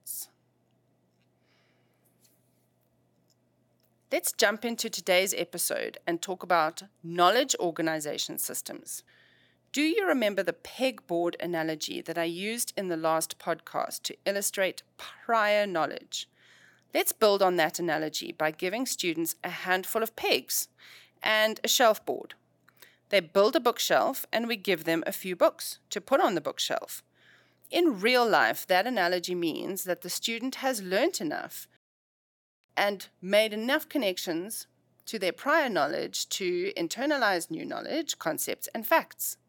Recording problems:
none

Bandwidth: 17.5 kHz